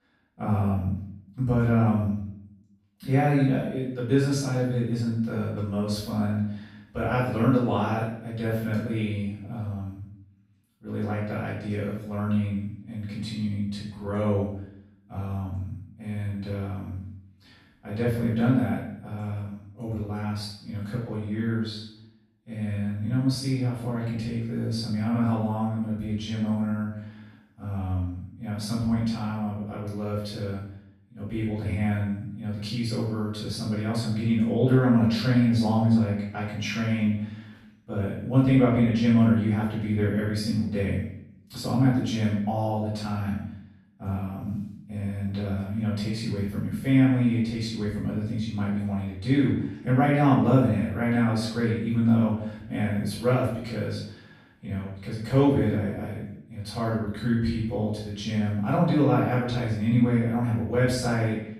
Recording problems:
off-mic speech; far
room echo; noticeable; dies away in 0.6 s

